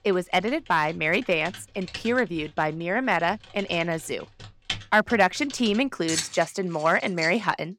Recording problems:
household noises; noticeable; throughout; 10 dB below the speech

